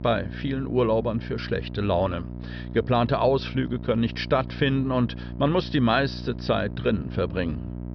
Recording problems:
high frequencies cut off; noticeable; nothing above 5.5 kHz
electrical hum; noticeable; throughout; 60 Hz, 20 dB below the speech

